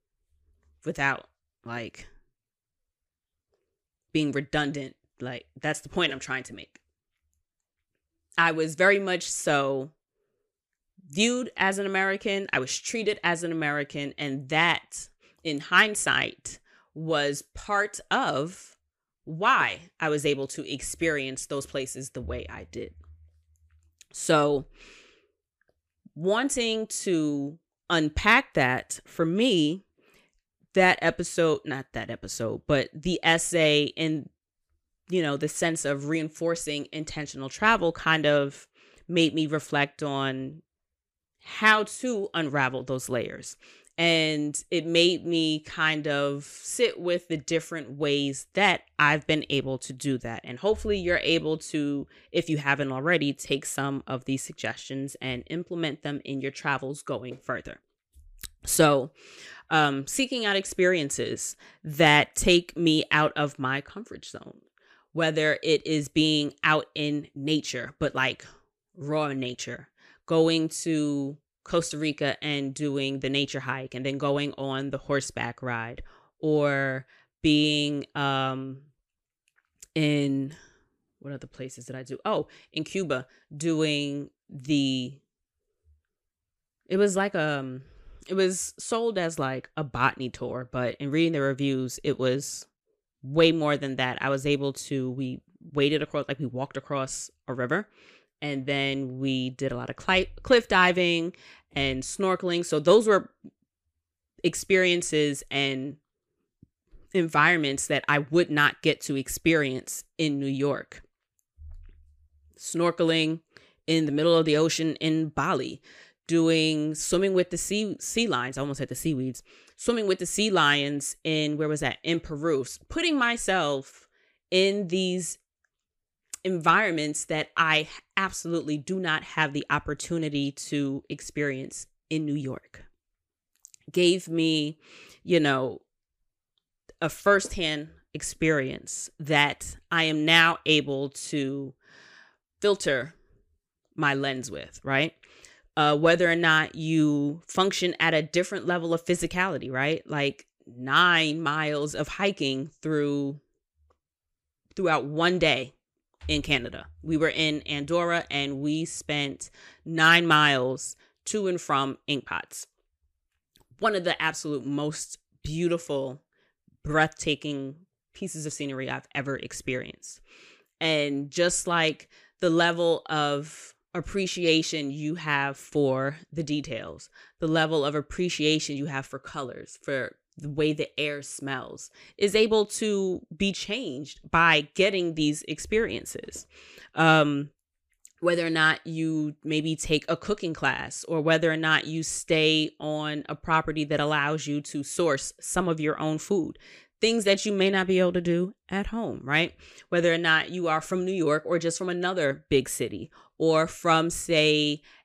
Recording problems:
none

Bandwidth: 15 kHz